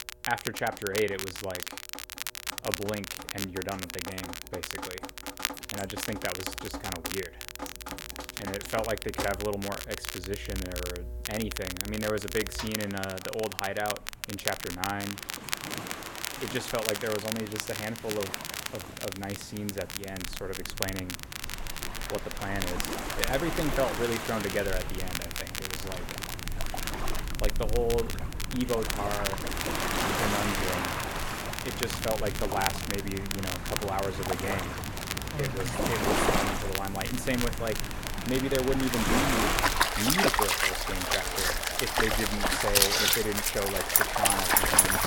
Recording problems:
rain or running water; very loud; throughout; 4 dB above the speech
crackle, like an old record; loud; 3 dB below the speech

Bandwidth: 17 kHz